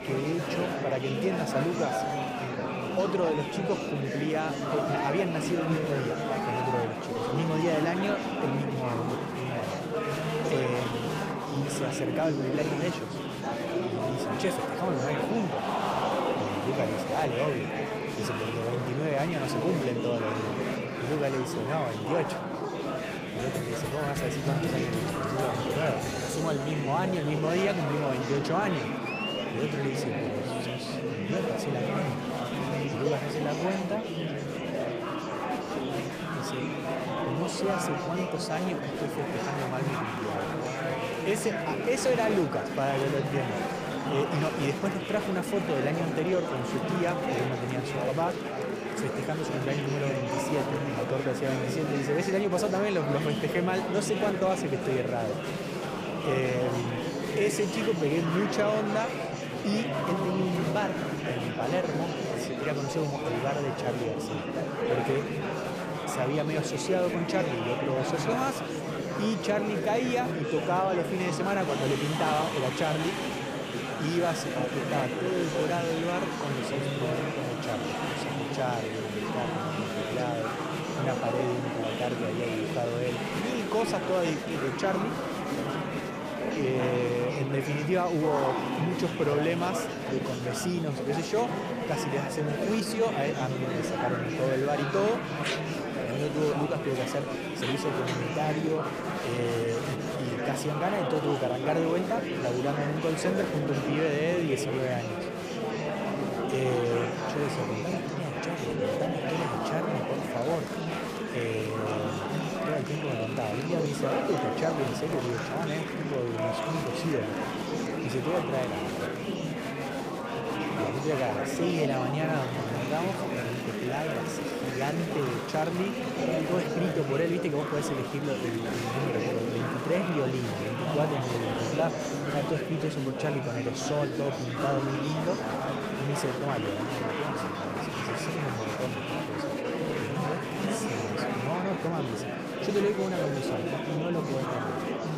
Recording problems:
murmuring crowd; very loud; throughout; as loud as the speech

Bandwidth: 15 kHz